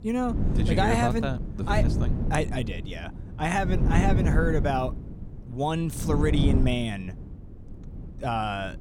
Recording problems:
wind noise on the microphone; heavy; 9 dB below the speech

